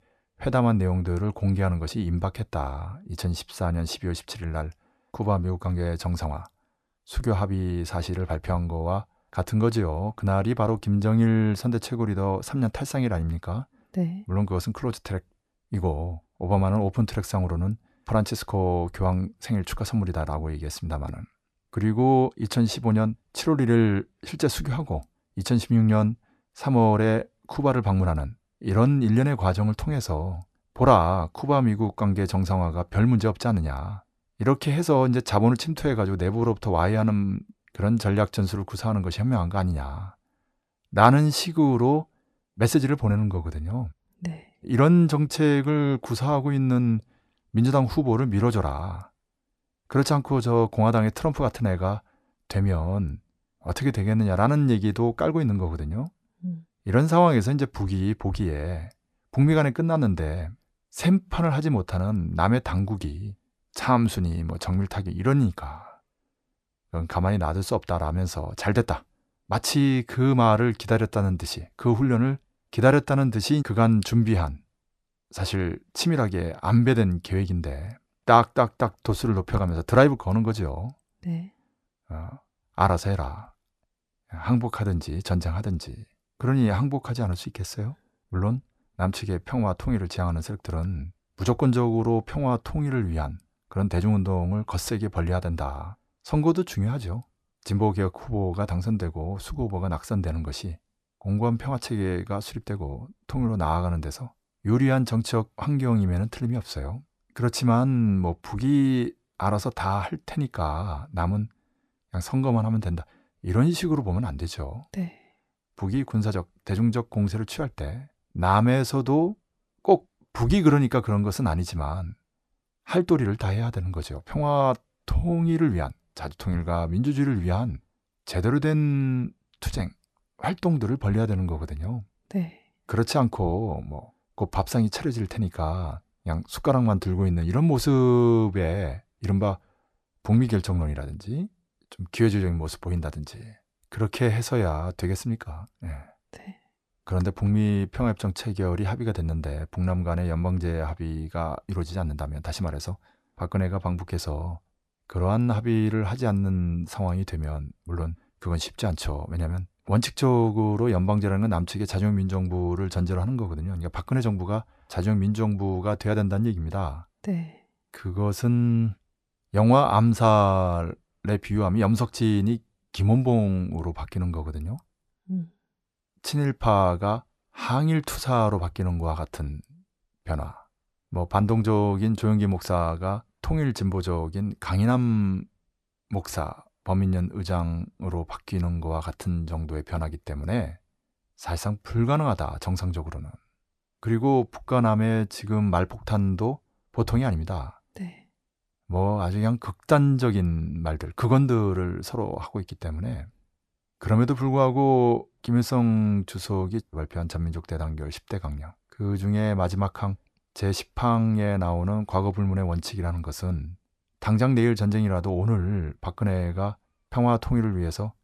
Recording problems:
none

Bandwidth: 14 kHz